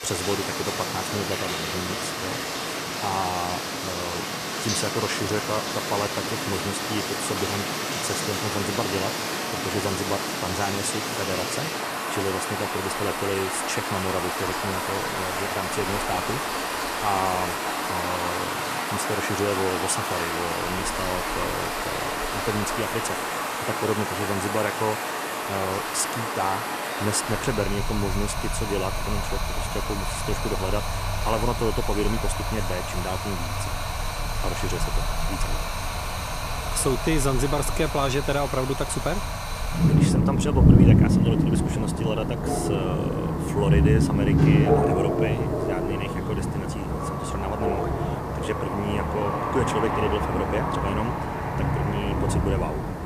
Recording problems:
rain or running water; very loud; throughout; 3 dB above the speech

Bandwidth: 14.5 kHz